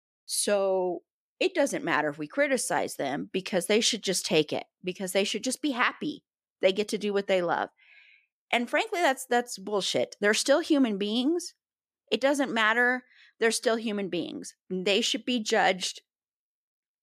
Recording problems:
none

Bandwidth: 14.5 kHz